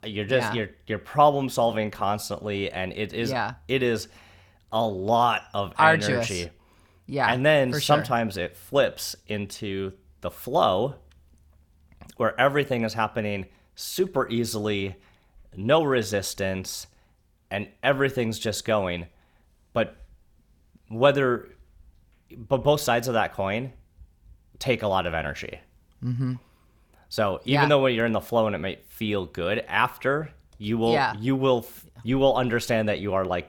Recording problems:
none

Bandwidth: 18.5 kHz